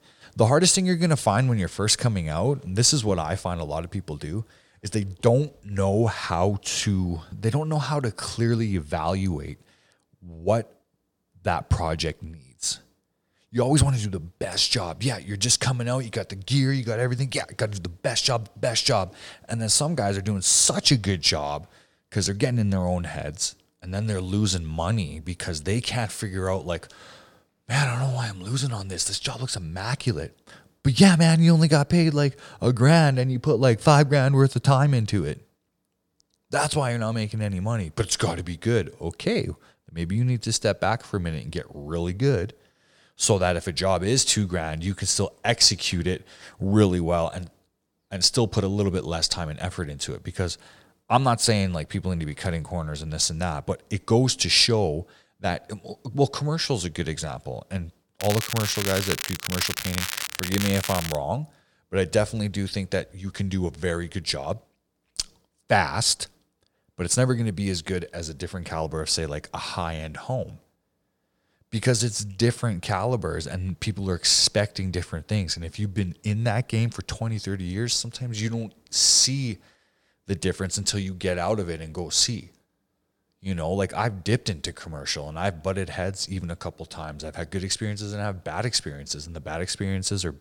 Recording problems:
crackling; loud; from 58 s to 1:01; 5 dB below the speech

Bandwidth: 17 kHz